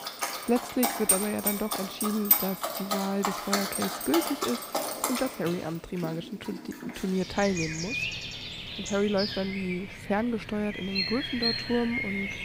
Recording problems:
animal sounds; very loud; throughout; 1 dB above the speech

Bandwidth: 15.5 kHz